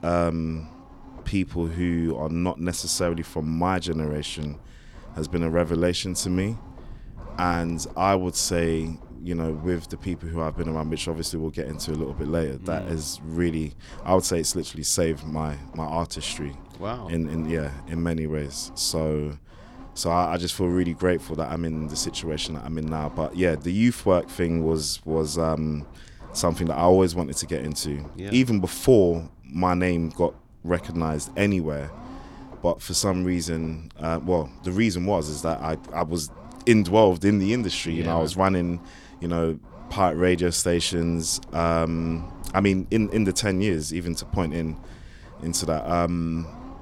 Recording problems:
low rumble; faint; throughout; 20 dB below the speech

